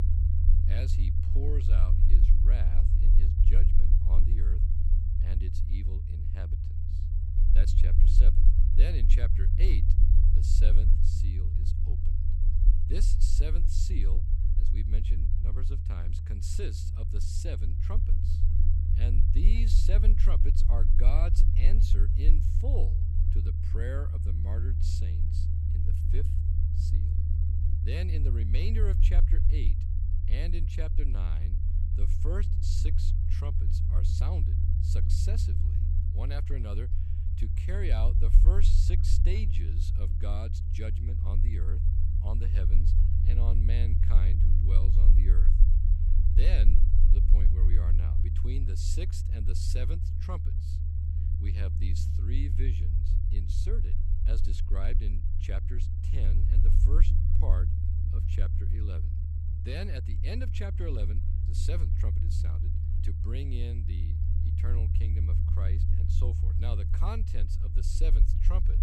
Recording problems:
low rumble; loud; throughout; 1 dB below the speech

